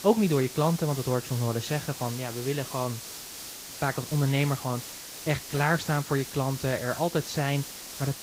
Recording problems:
garbled, watery; slightly; nothing above 8 kHz
hiss; loud; throughout; 10 dB below the speech

